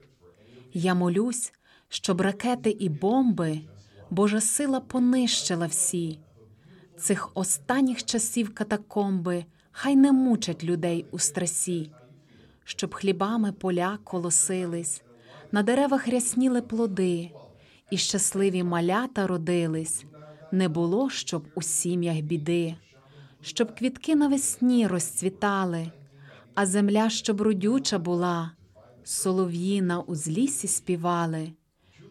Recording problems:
voice in the background; faint; throughout; 25 dB below the speech

